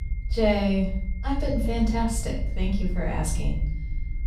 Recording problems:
off-mic speech; far
room echo; noticeable; dies away in 0.7 s
high-pitched whine; faint; throughout; 2 kHz, 25 dB below the speech
low rumble; faint; throughout; 20 dB below the speech

